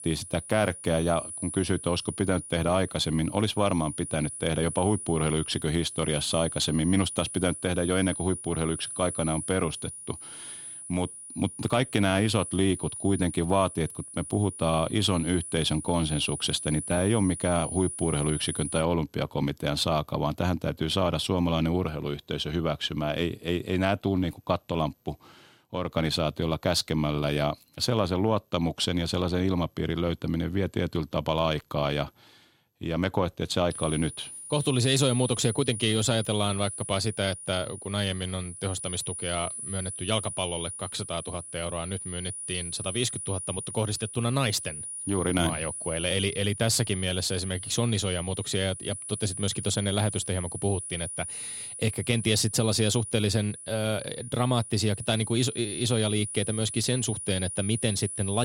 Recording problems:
high-pitched whine; loud; until 19 s and from 34 s on; 9.5 kHz, 8 dB below the speech
abrupt cut into speech; at the end

